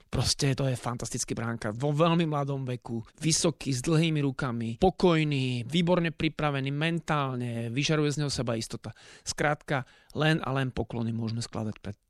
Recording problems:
none

